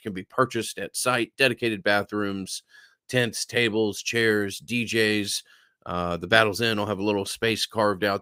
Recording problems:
none

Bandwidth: 15.5 kHz